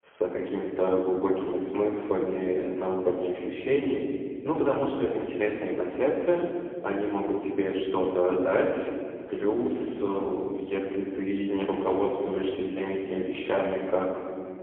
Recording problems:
phone-call audio; poor line; nothing above 3 kHz
off-mic speech; far
room echo; noticeable; dies away in 2.1 s

